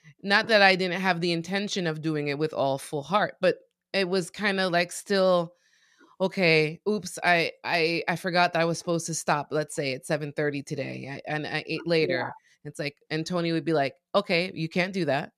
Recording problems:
none

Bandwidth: 14 kHz